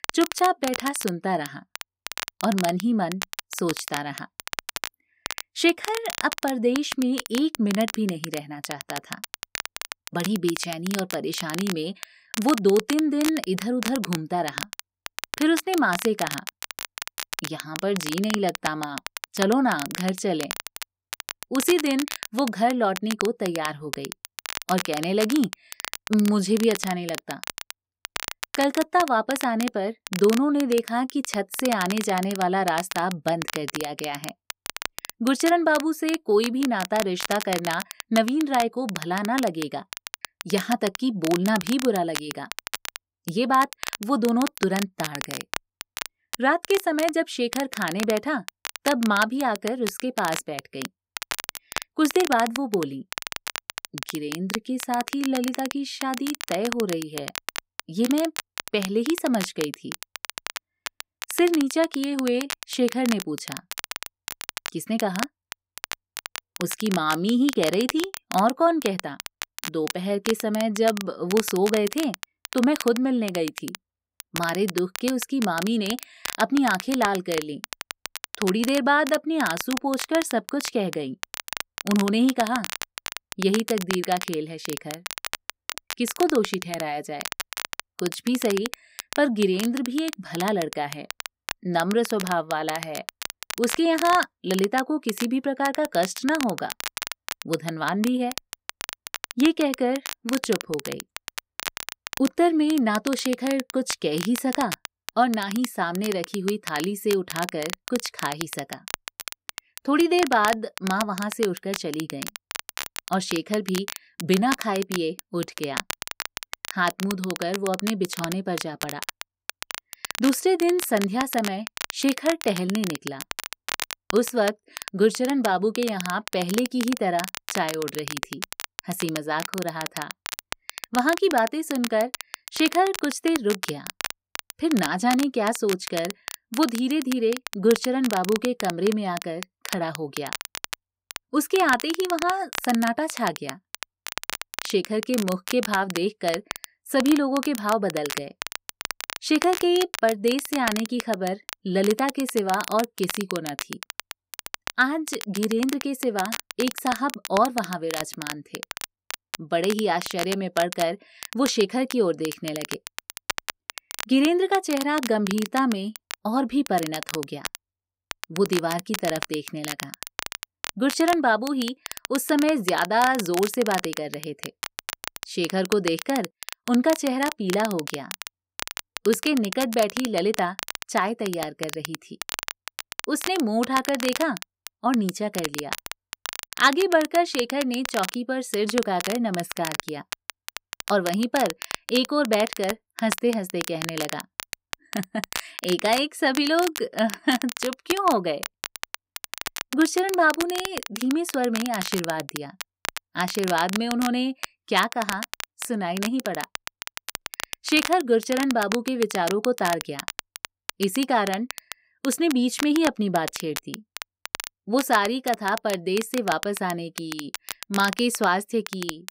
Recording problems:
crackle, like an old record; loud; 9 dB below the speech

